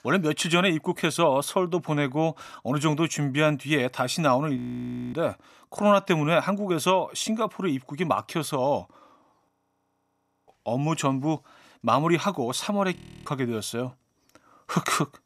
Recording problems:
audio freezing; at 4.5 s for 0.5 s, at 9.5 s for 1 s and at 13 s

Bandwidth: 14.5 kHz